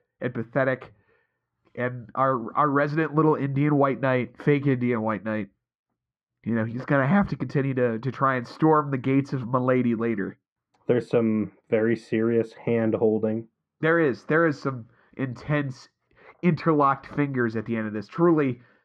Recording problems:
muffled; very; fading above 1.5 kHz

